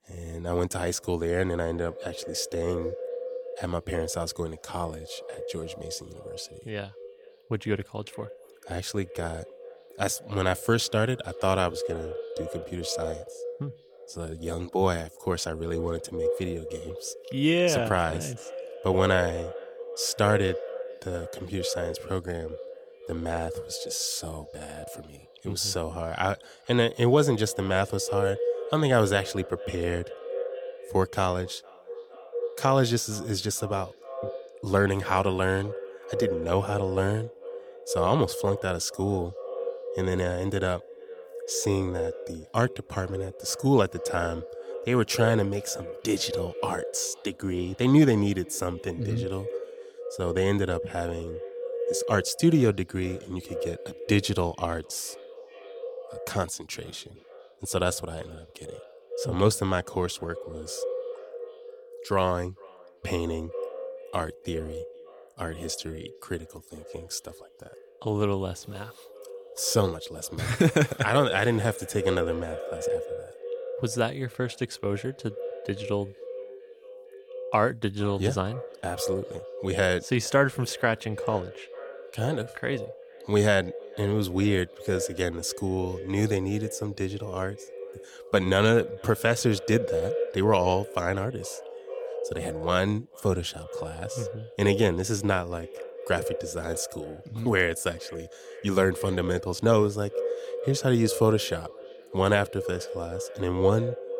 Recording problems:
echo of what is said; strong; throughout; 460 ms later, 9 dB below the speech

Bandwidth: 17 kHz